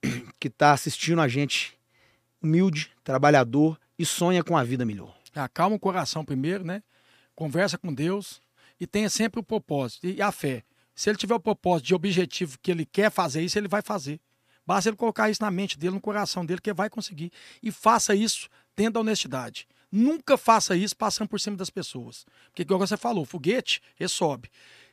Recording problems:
none

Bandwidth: 15 kHz